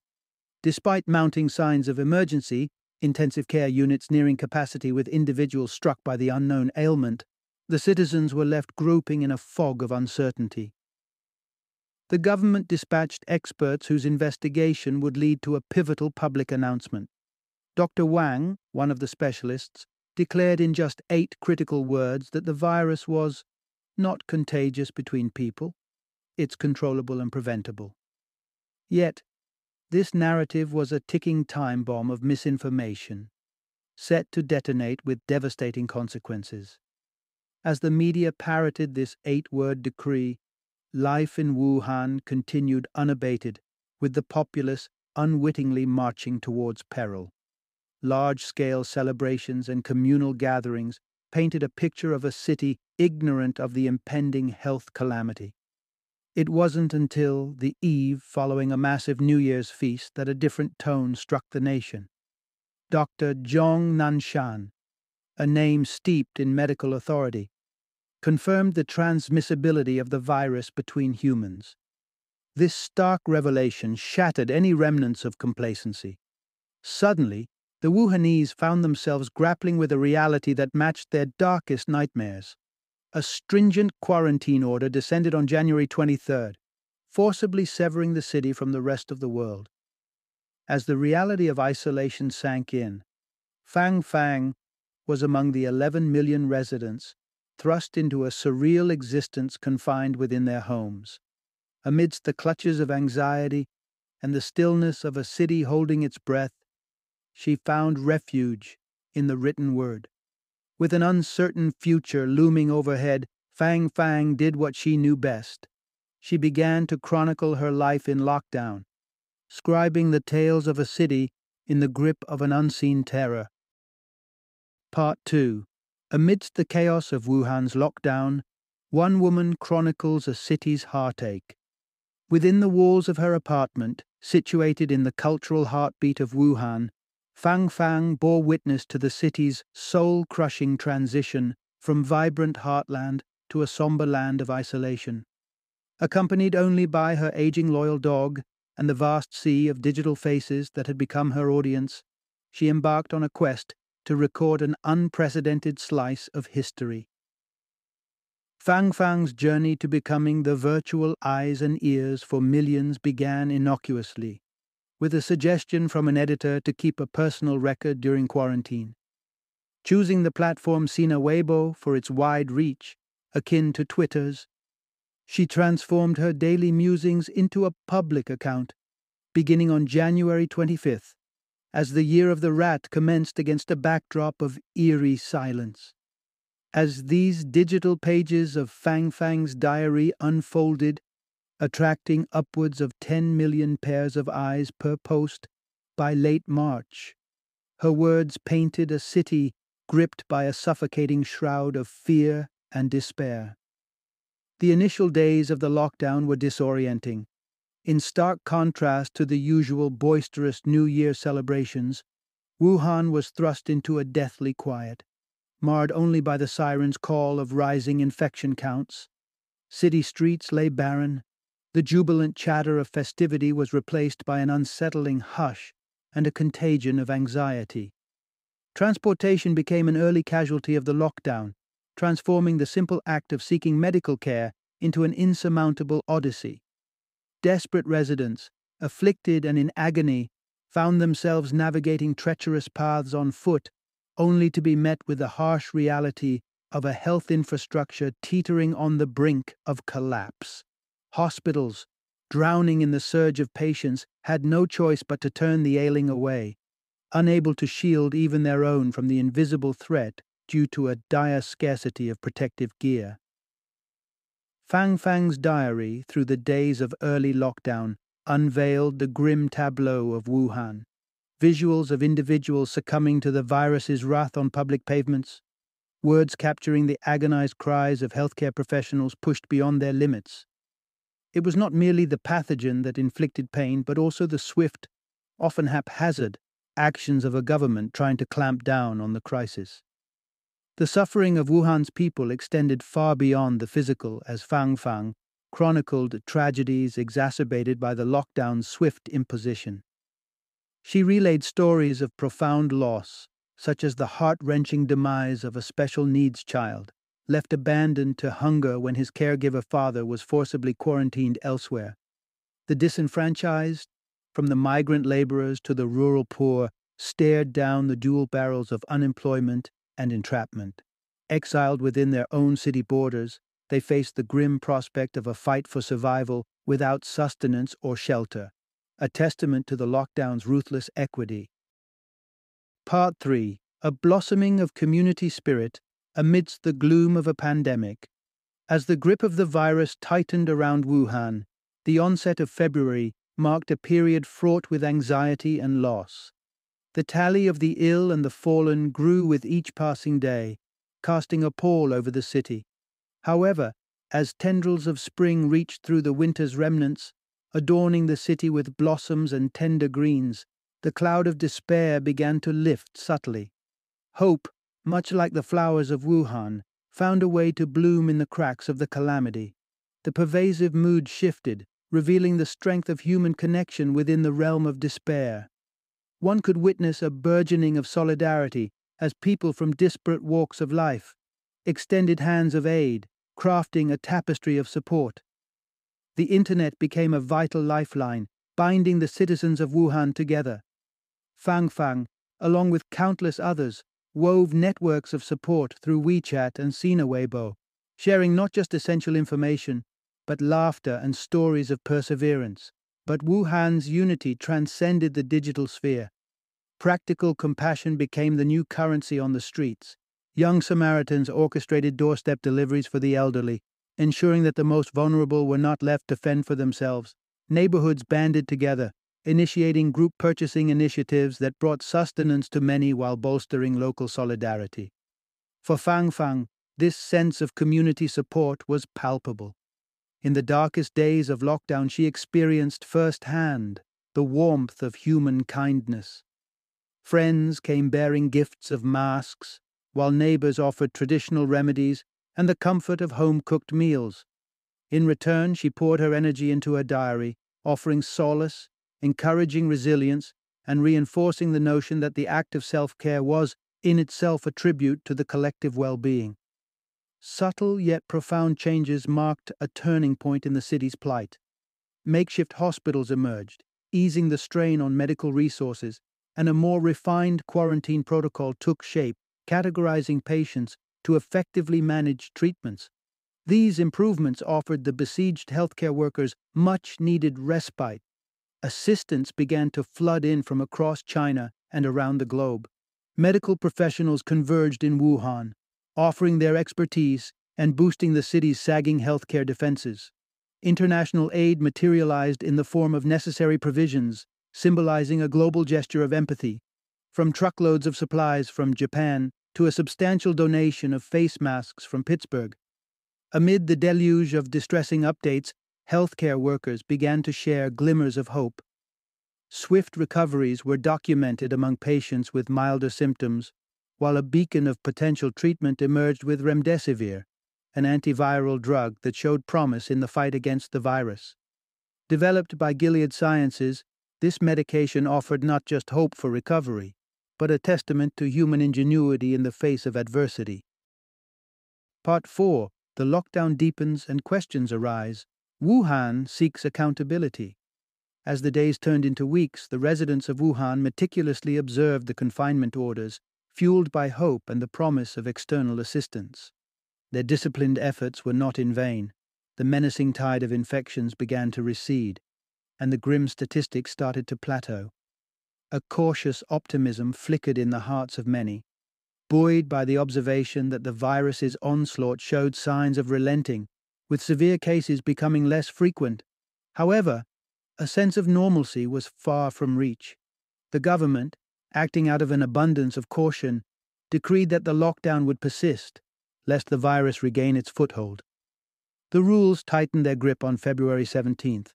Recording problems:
none

